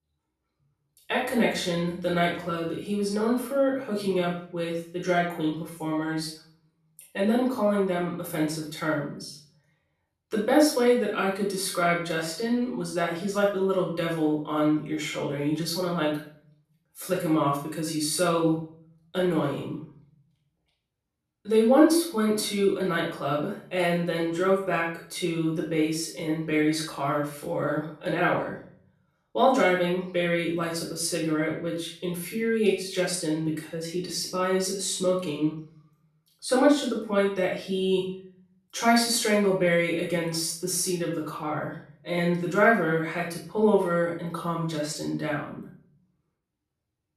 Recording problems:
off-mic speech; far
room echo; noticeable; dies away in 0.5 s

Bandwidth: 13.5 kHz